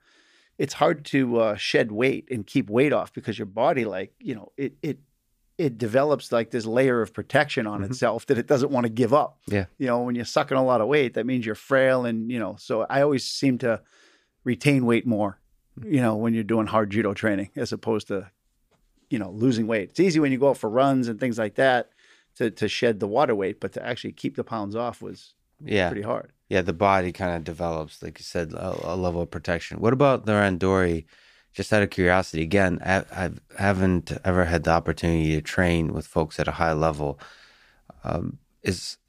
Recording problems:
none

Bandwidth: 15 kHz